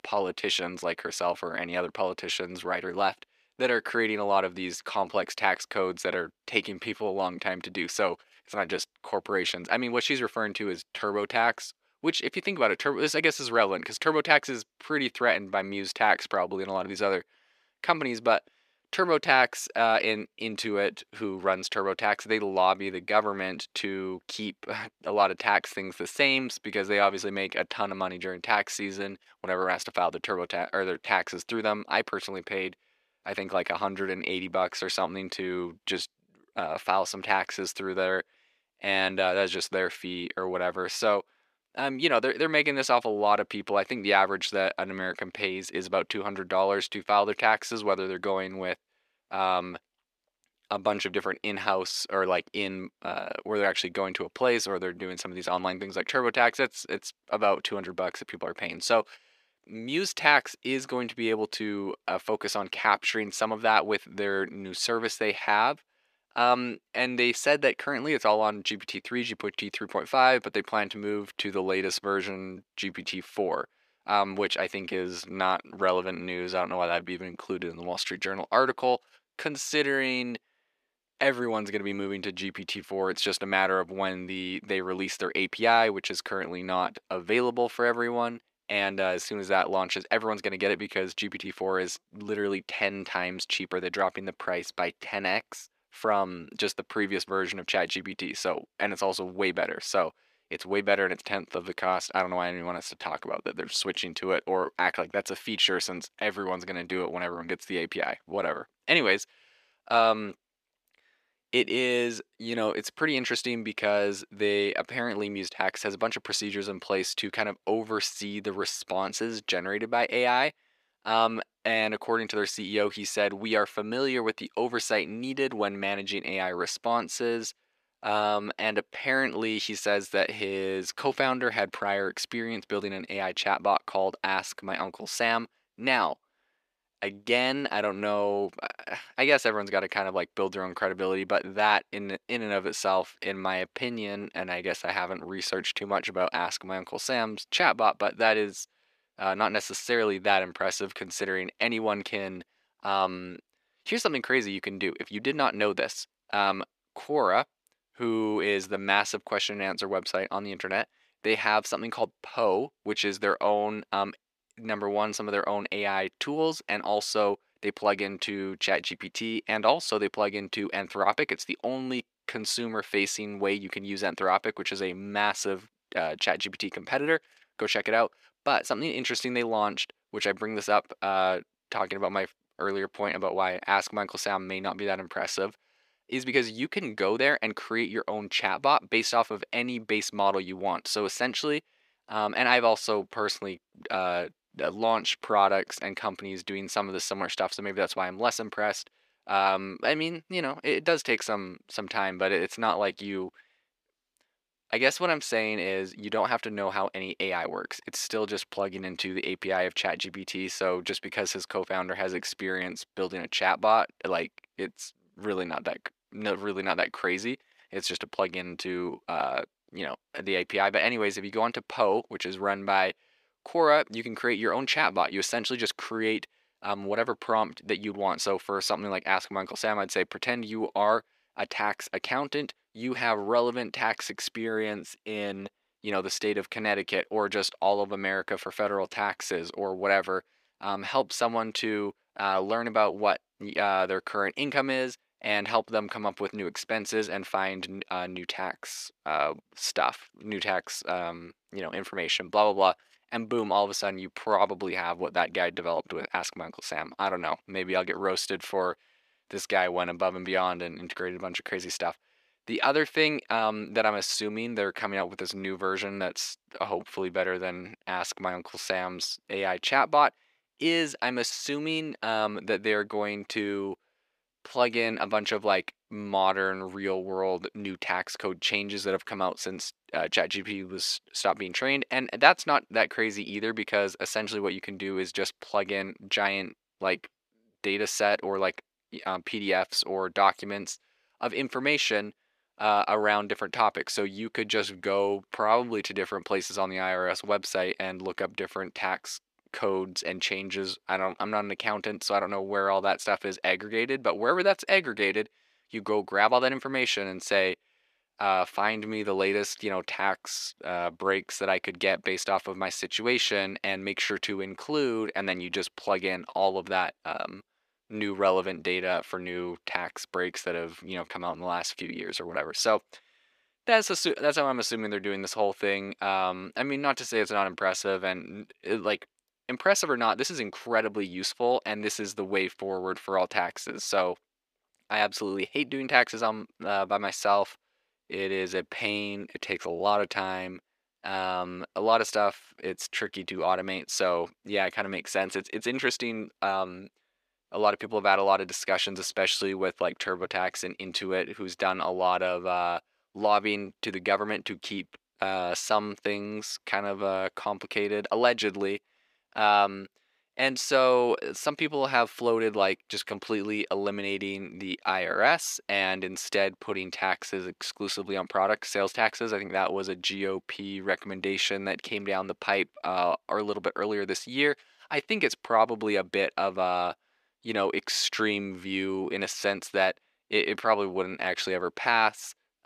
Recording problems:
thin; somewhat; fading below 400 Hz

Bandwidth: 14.5 kHz